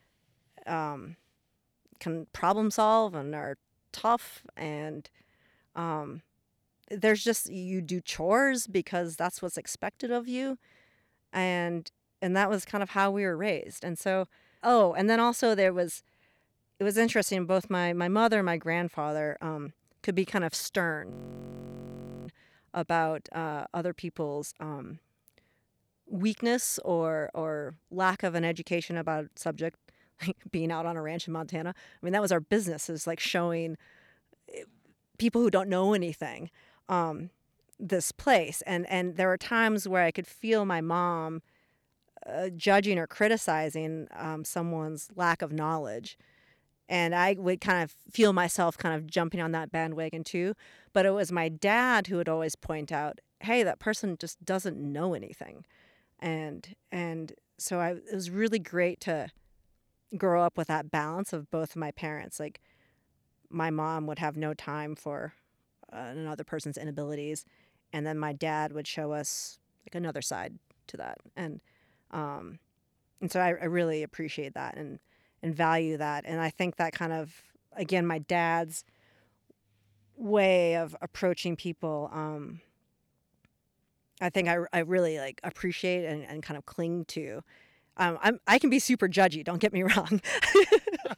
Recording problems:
audio freezing; at 21 s for 1 s

